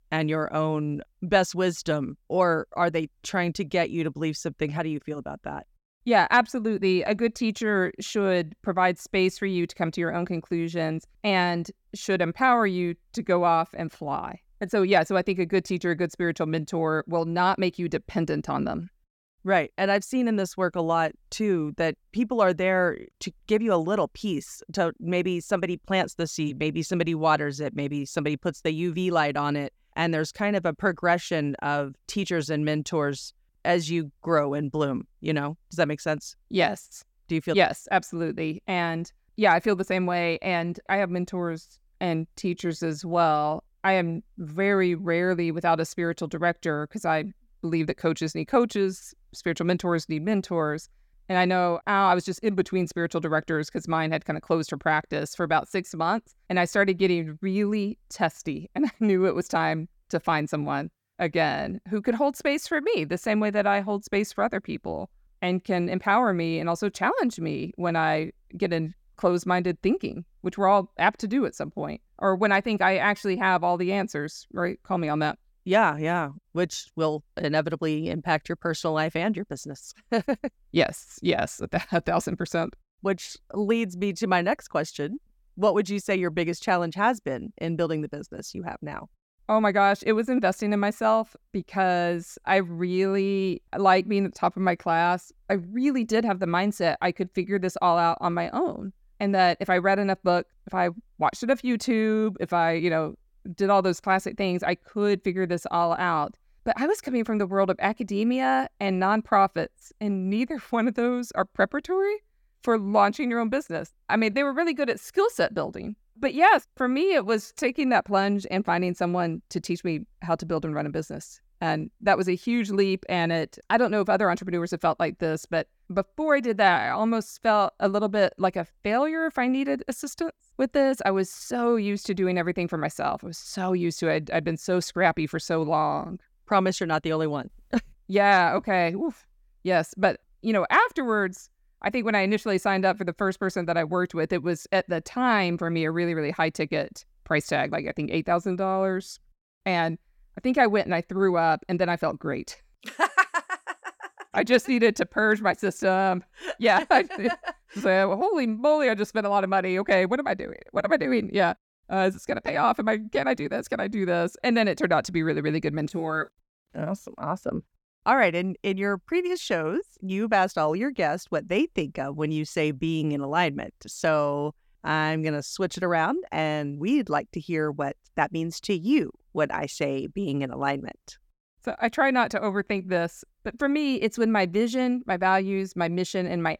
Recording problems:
uneven, jittery; strongly; from 42 s to 2:55

